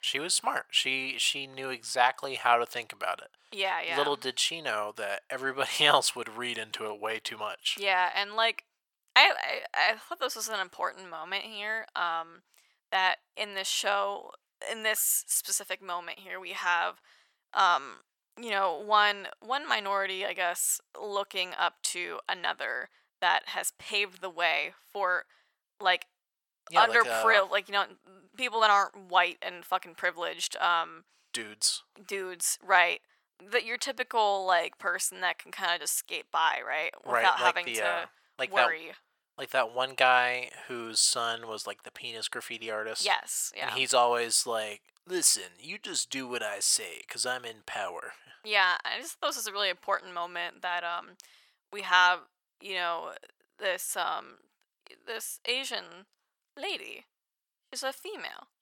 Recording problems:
thin; very; fading below 950 Hz

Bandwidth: 17.5 kHz